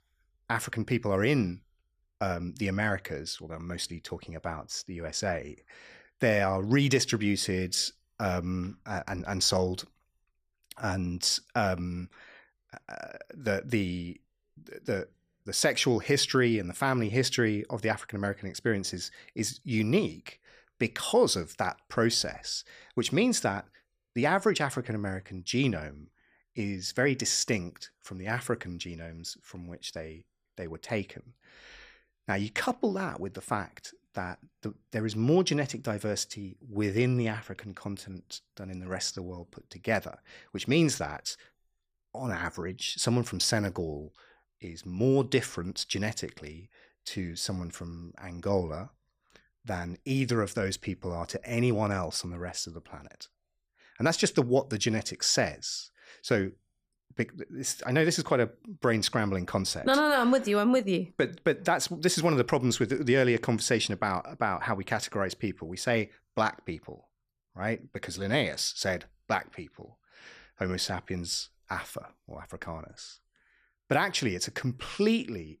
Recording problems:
none

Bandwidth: 15 kHz